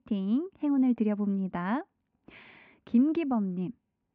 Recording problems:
muffled; very; fading above 2.5 kHz

